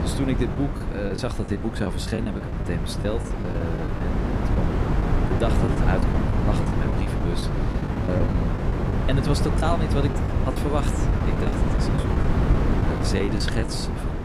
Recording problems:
wind noise on the microphone; heavy; 1 dB above the speech
choppy; very; 11% of the speech affected

